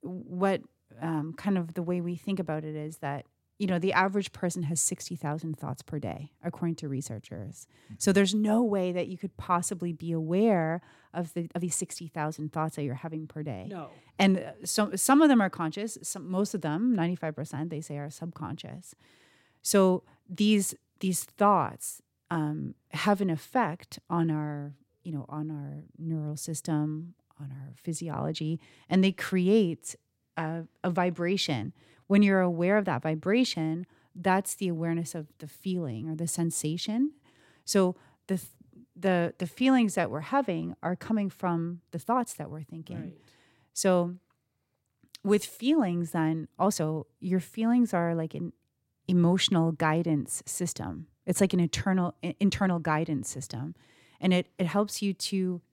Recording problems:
uneven, jittery; strongly; from 1 to 53 s

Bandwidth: 16.5 kHz